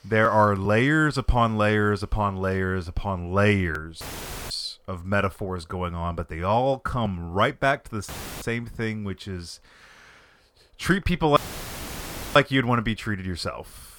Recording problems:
audio cutting out; filled with static; at 4 s, at 8 s and at 11 s for 1 s

